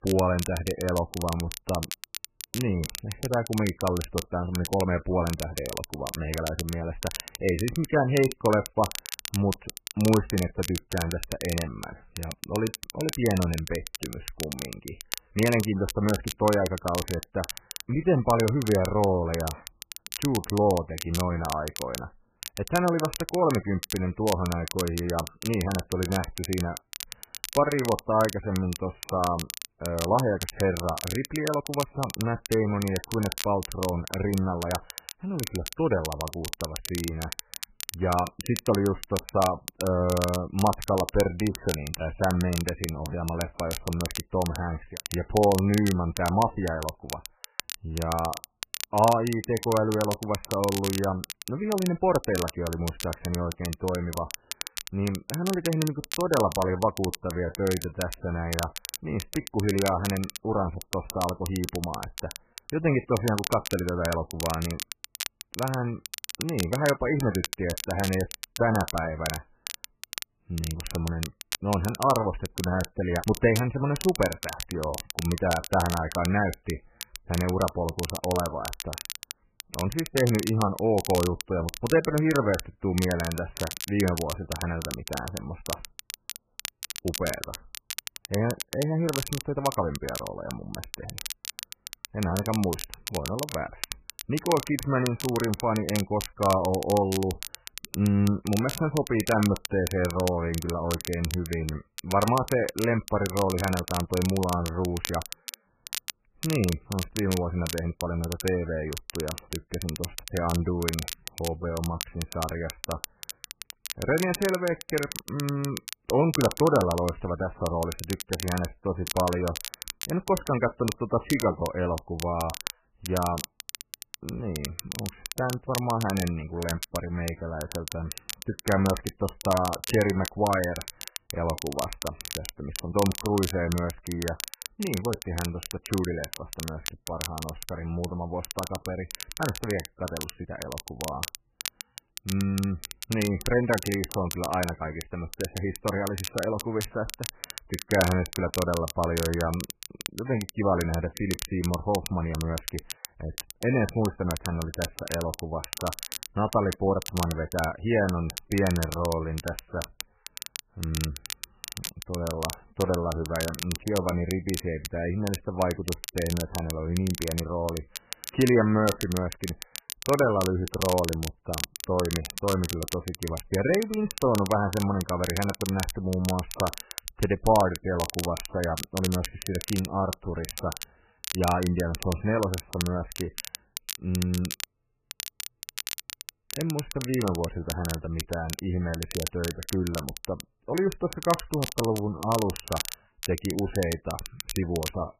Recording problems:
garbled, watery; badly; nothing above 2.5 kHz
crackle, like an old record; loud; 9 dB below the speech
uneven, jittery; strongly; from 27 s to 3:12

